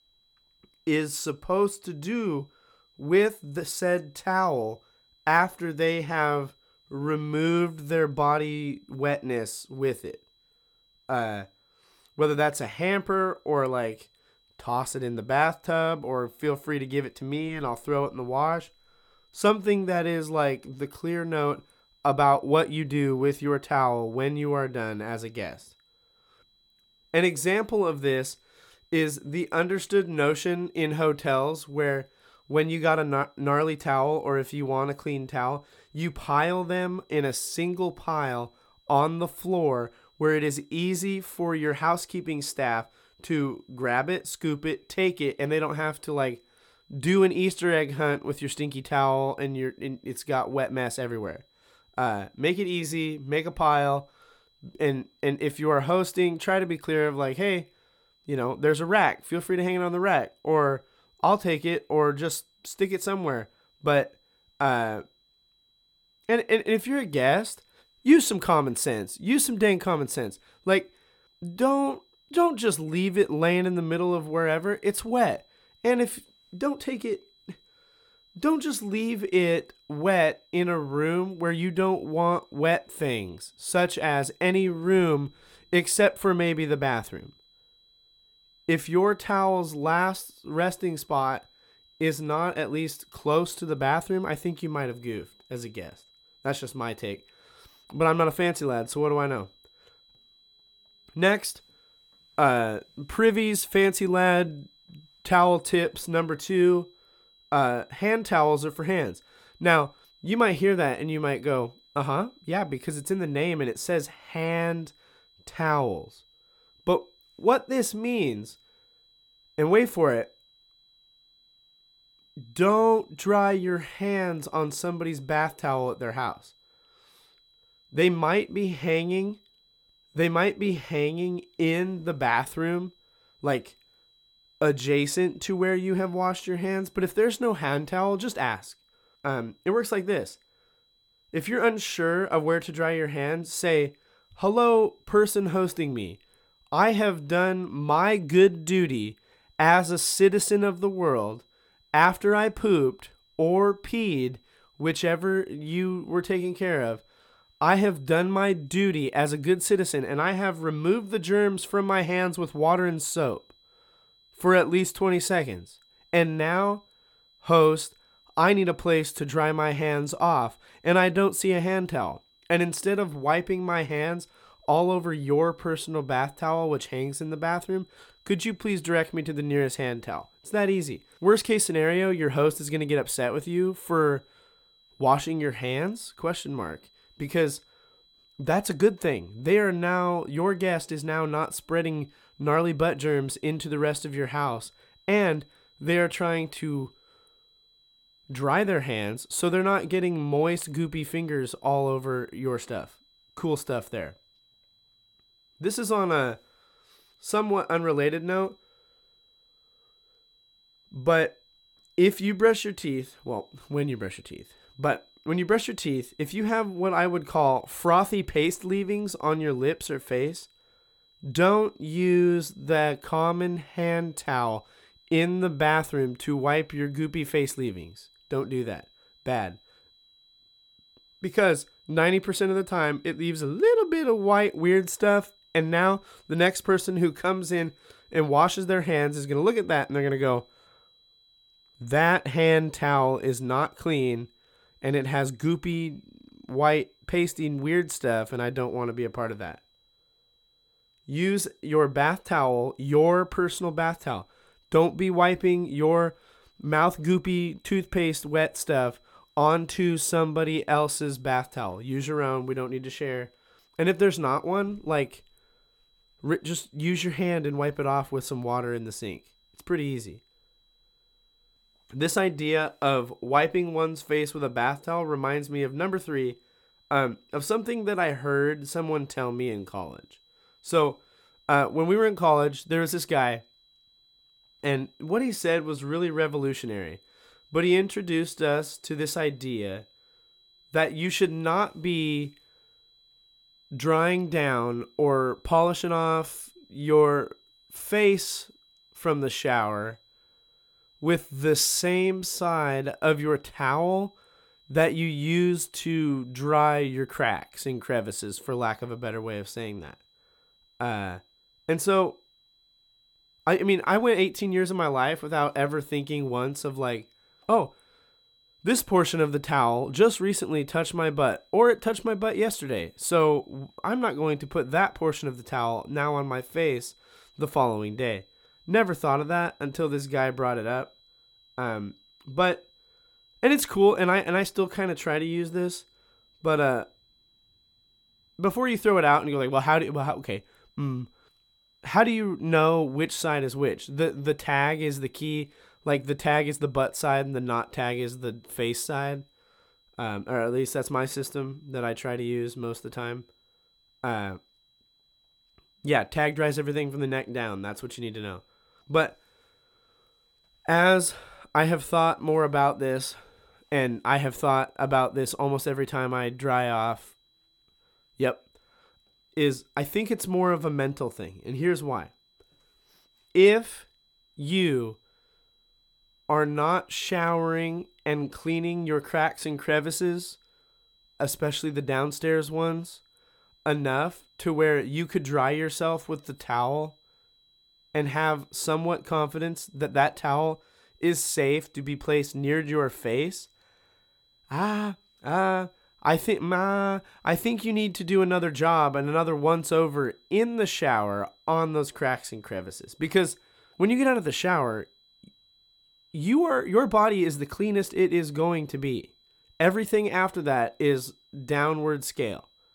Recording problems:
high-pitched whine; faint; throughout; 4 kHz, 35 dB below the speech

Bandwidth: 17.5 kHz